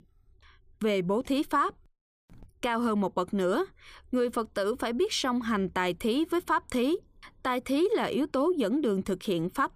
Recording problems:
none

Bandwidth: 15 kHz